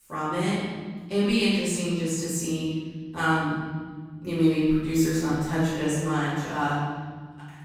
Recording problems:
room echo; strong; dies away in 1.9 s
off-mic speech; far

